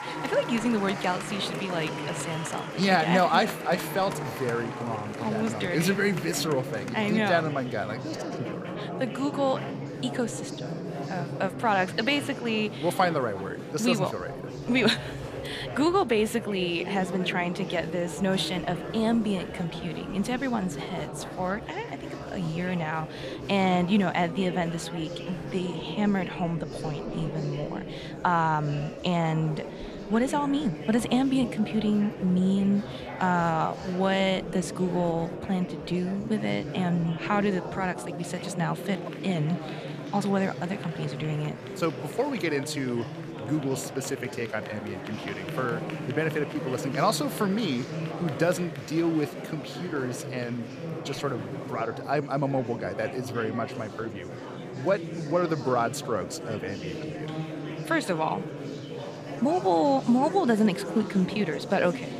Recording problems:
murmuring crowd; loud; throughout; 8 dB below the speech

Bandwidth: 14.5 kHz